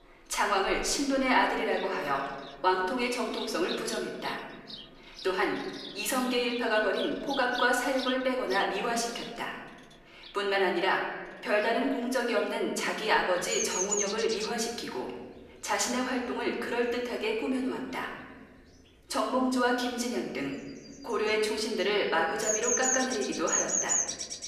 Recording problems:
off-mic speech; far
room echo; noticeable; dies away in 1.3 s
animal sounds; loud; throughout; 4 dB below the speech

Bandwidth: 14.5 kHz